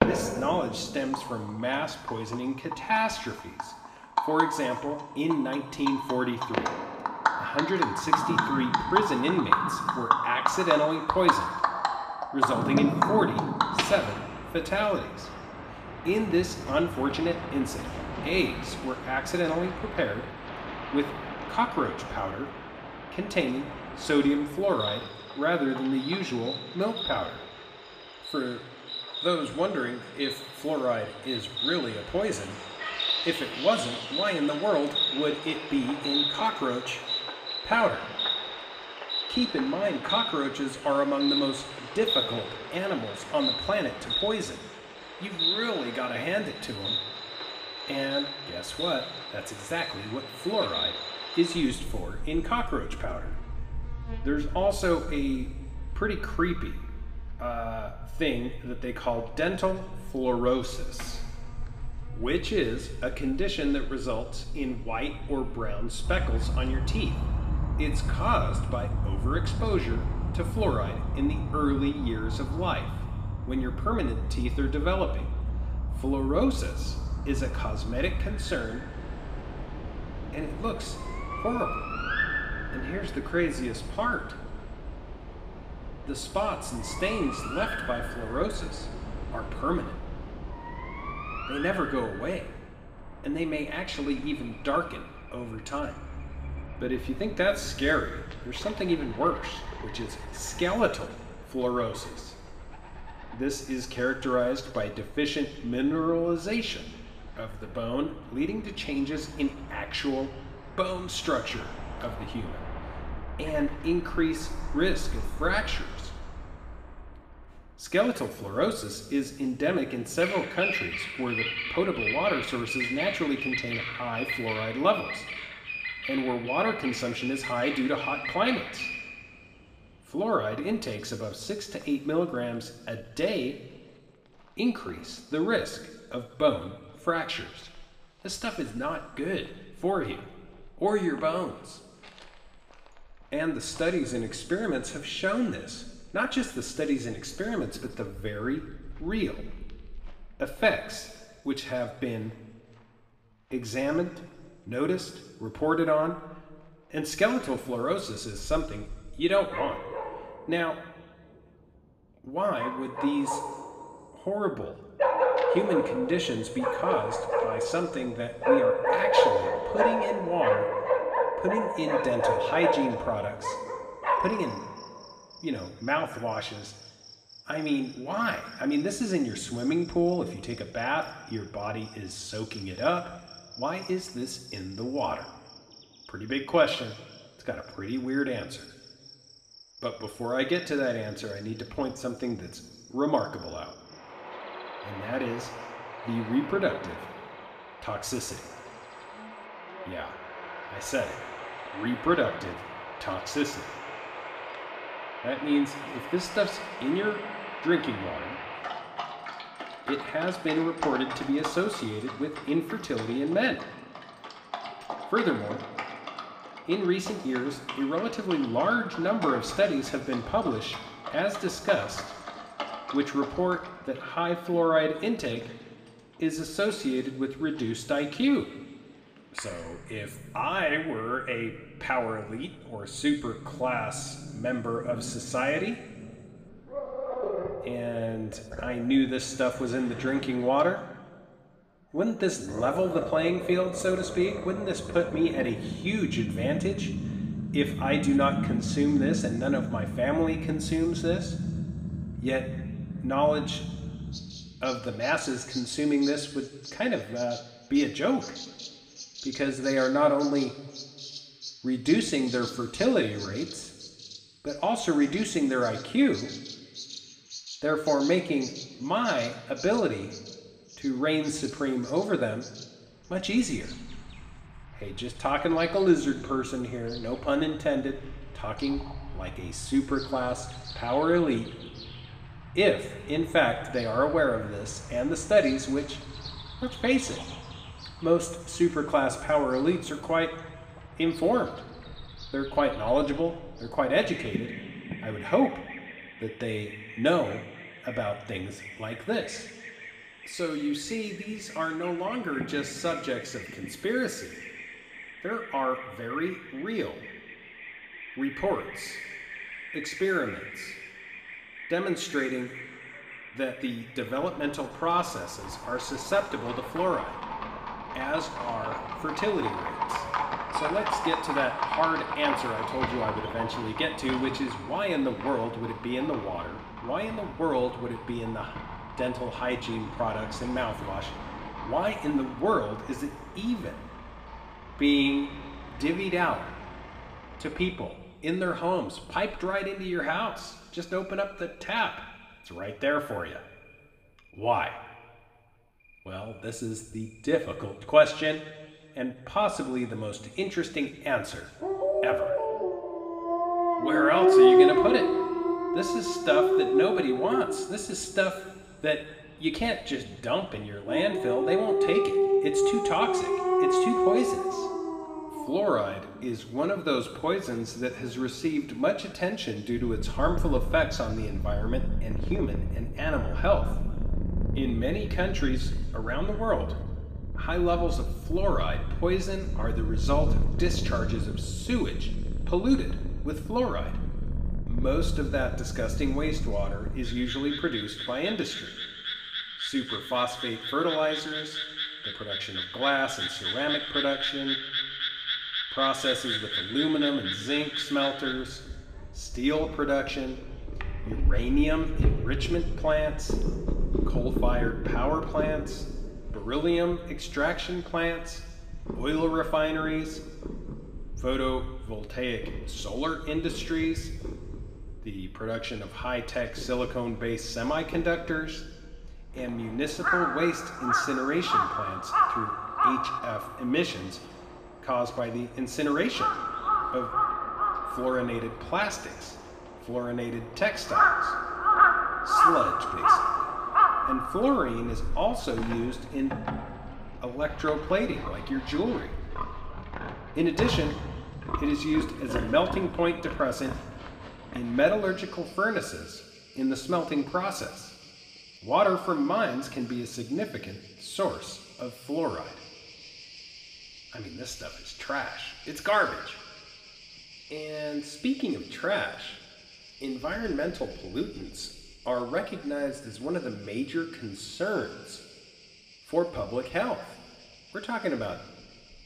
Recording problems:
room echo; slight; dies away in 1.2 s
off-mic speech; somewhat distant
animal sounds; loud; throughout; 2 dB below the speech

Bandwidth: 15 kHz